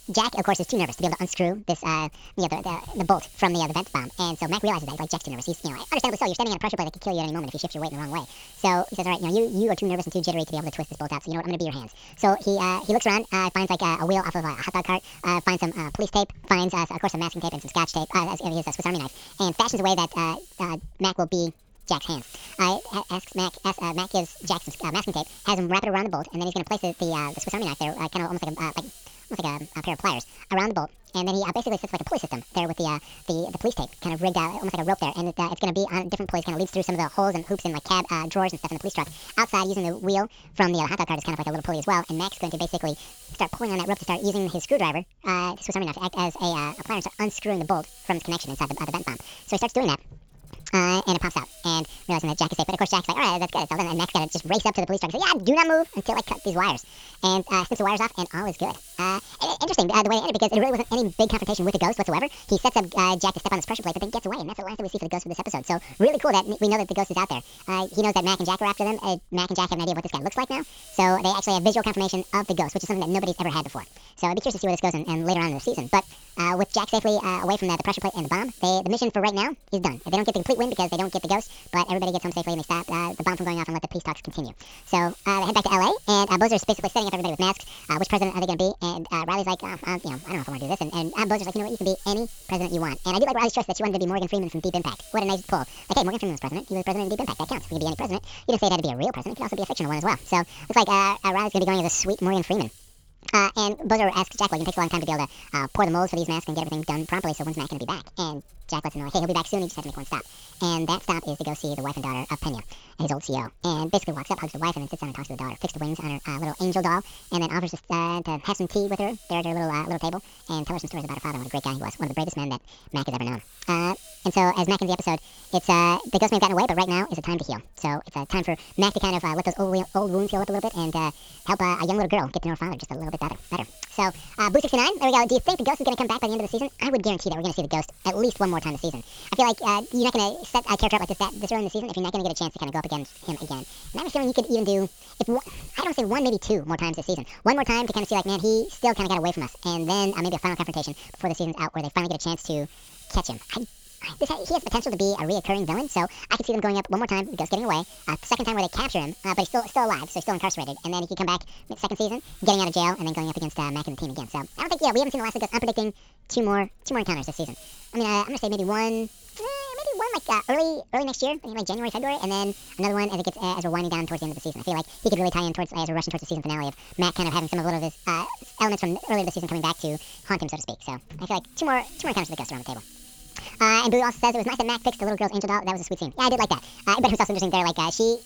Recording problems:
wrong speed and pitch; too fast and too high; 1.7 times normal speed
high frequencies cut off; noticeable; nothing above 8 kHz
hiss; faint; throughout; 20 dB below the speech

